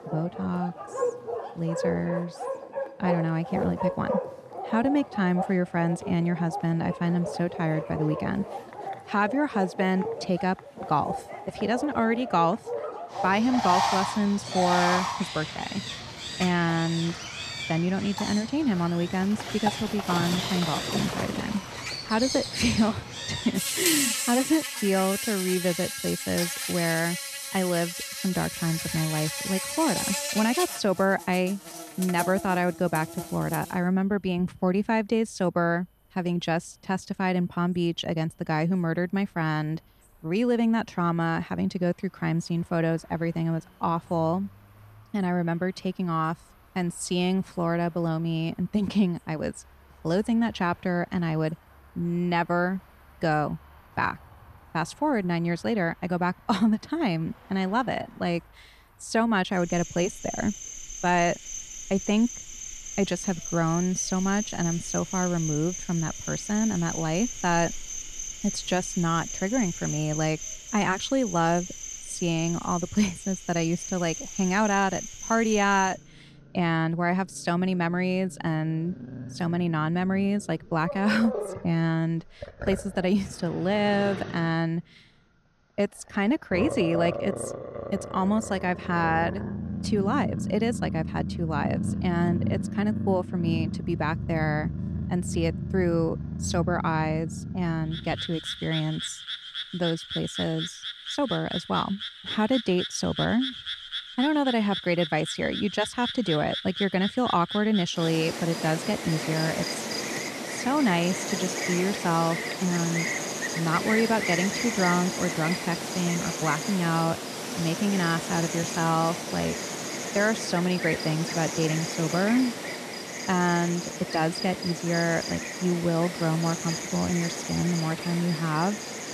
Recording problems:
animal sounds; loud; throughout; 5 dB below the speech

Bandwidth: 14 kHz